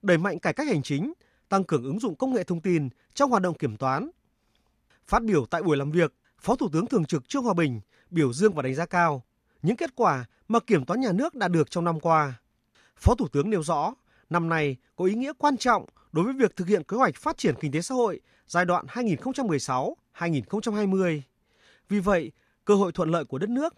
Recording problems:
none

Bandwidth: 14.5 kHz